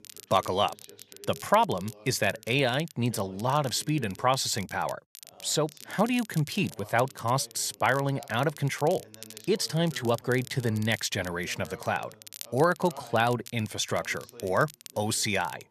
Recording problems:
crackle, like an old record; noticeable; 20 dB below the speech
voice in the background; faint; throughout; 25 dB below the speech

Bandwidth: 14 kHz